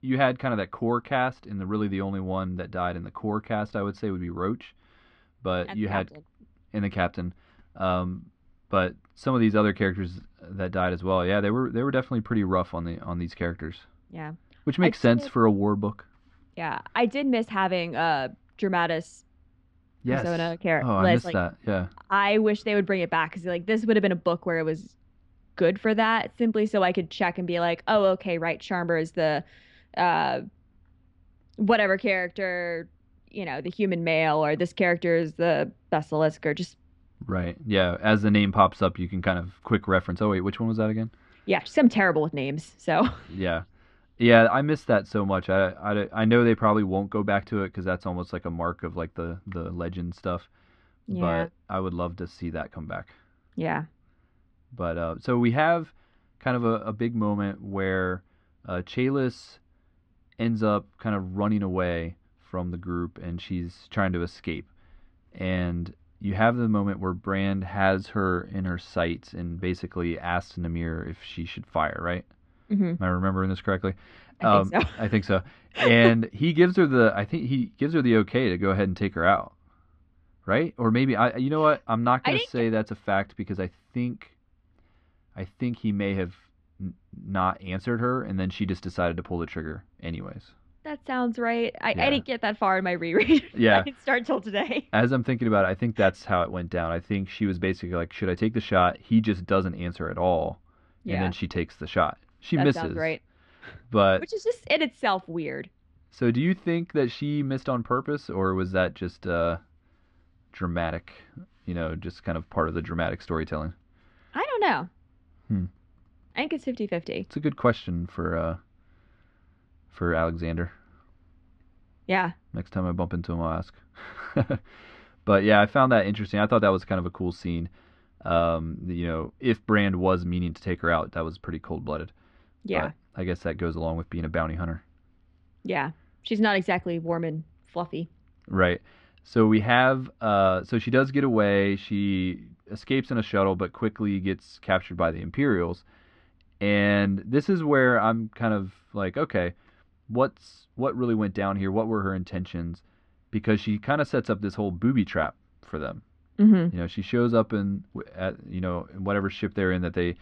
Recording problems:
muffled; slightly; fading above 3 kHz

